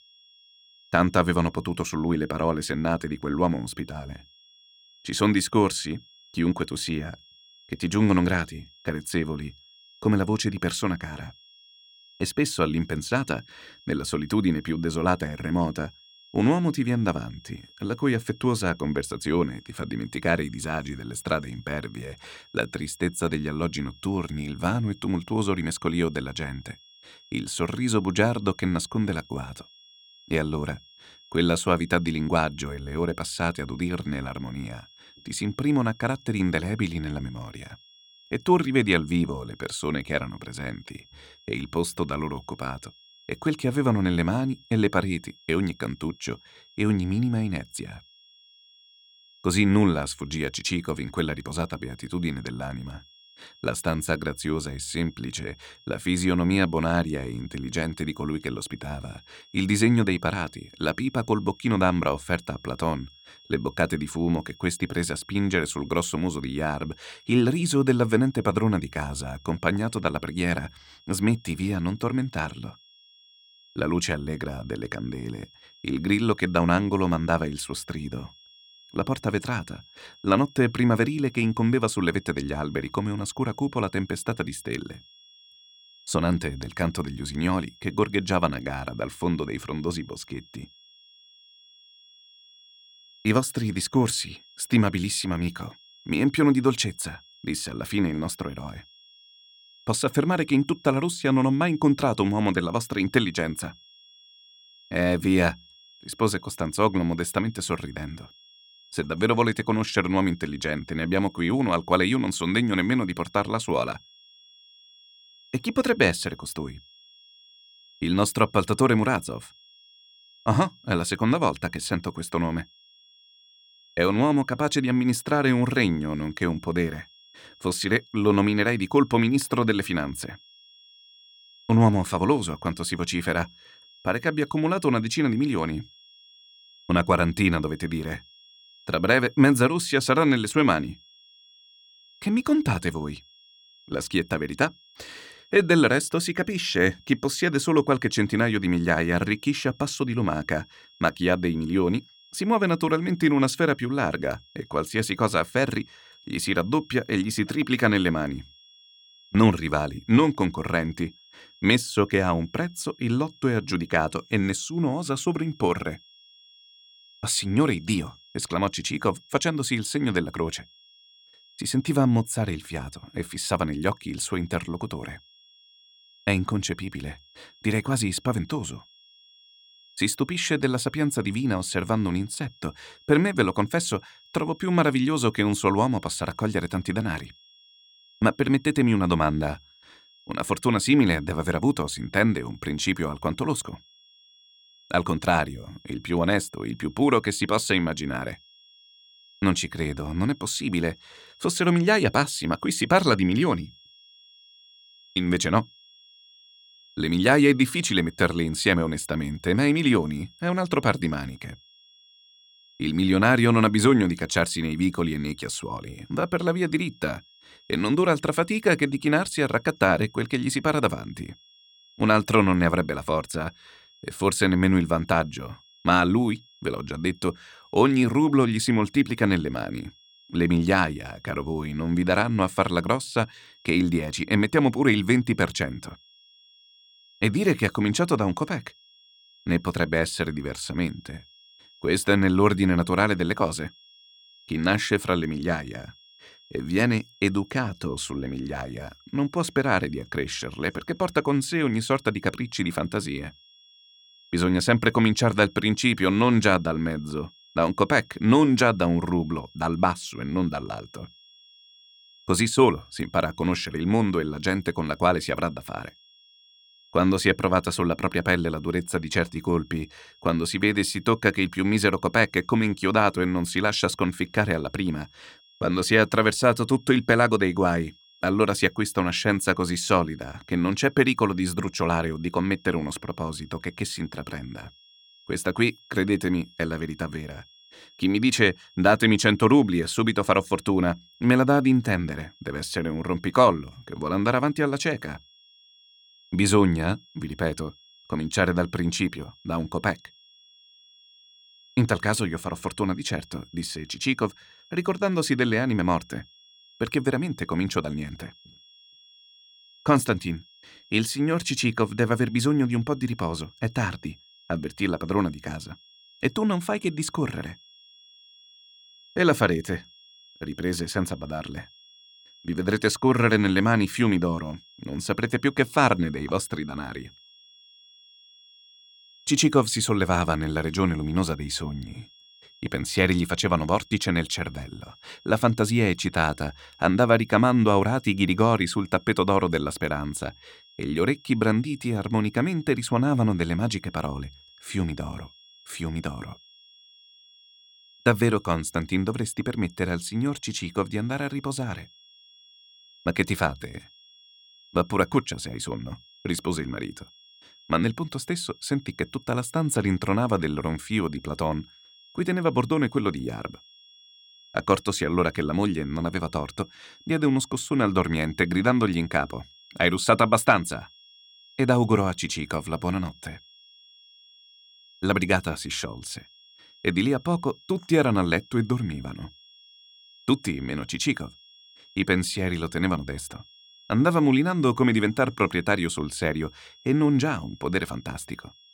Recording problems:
high-pitched whine; faint; throughout; 3.5 kHz, 25 dB below the speech

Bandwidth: 17 kHz